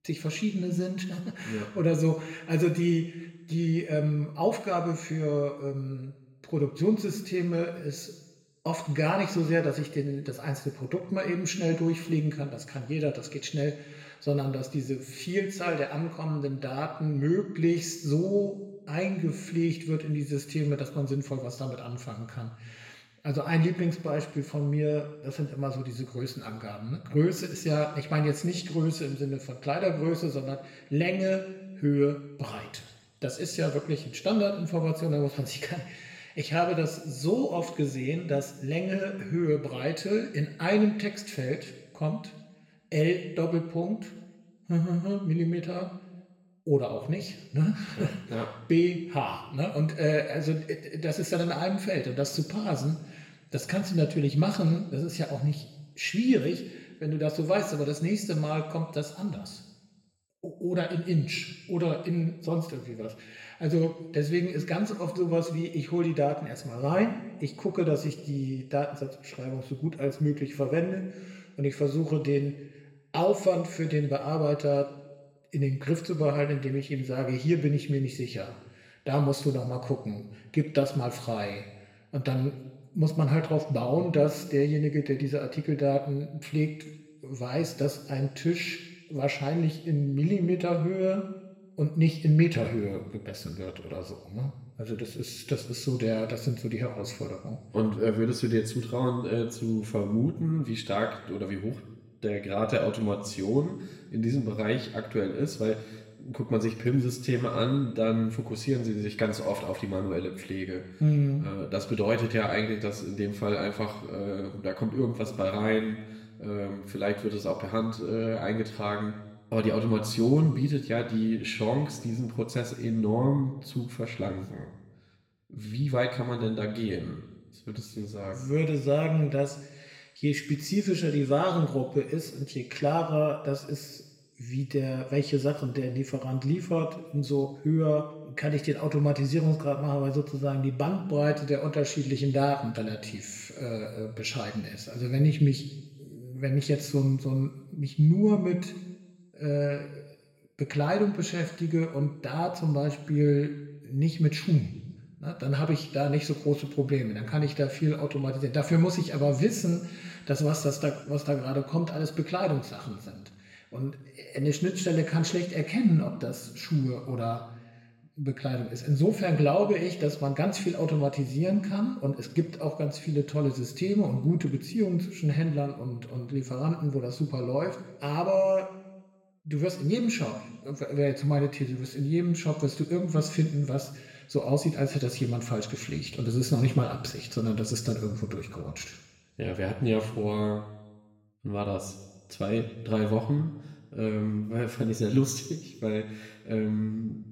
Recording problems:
room echo; slight; dies away in 1 s
off-mic speech; somewhat distant

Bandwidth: 16 kHz